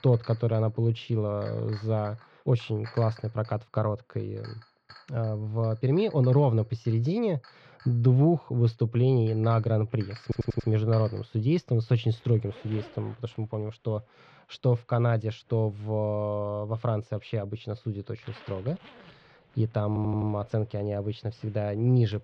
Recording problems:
muffled; slightly; fading above 3 kHz
household noises; faint; throughout; 25 dB below the speech
audio stuttering; at 10 s and at 20 s

